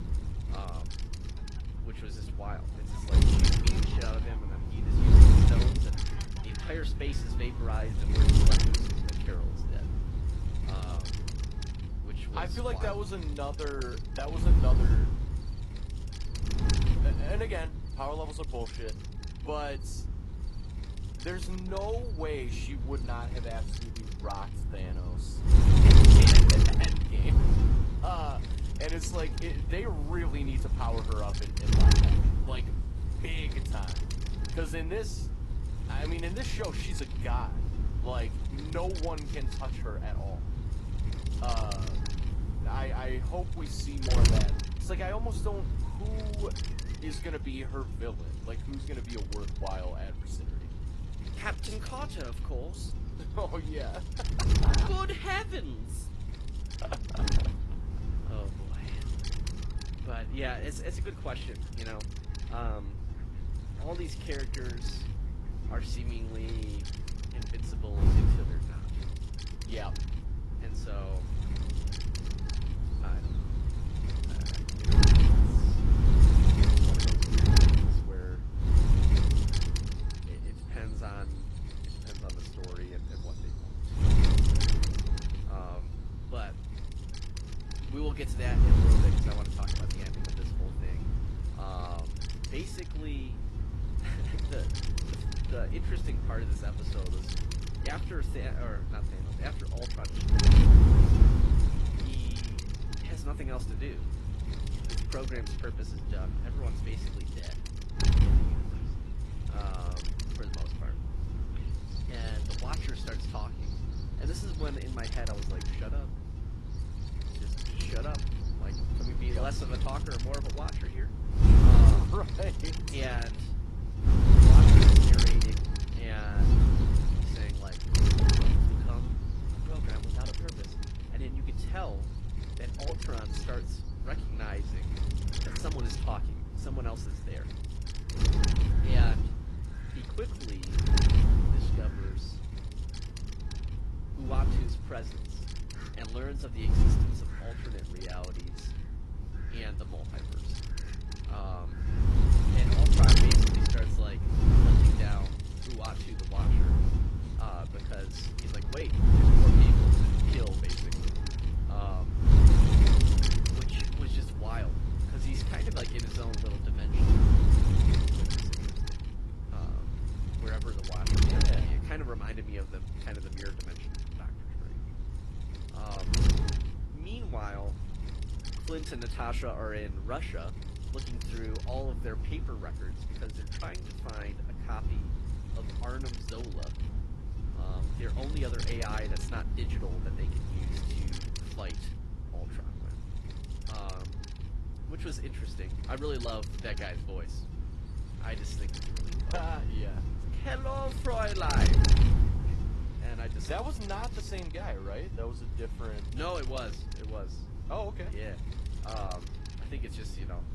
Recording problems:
garbled, watery; slightly; nothing above 11.5 kHz
wind noise on the microphone; heavy; 1 dB above the speech
animal sounds; noticeable; throughout; 20 dB below the speech

